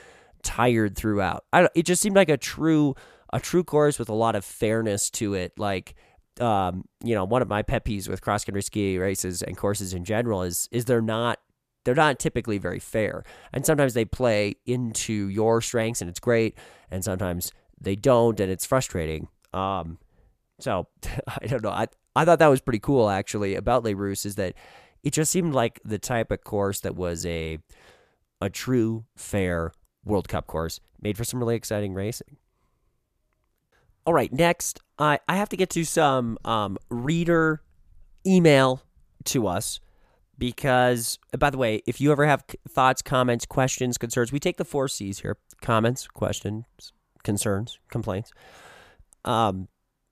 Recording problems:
none

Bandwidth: 14.5 kHz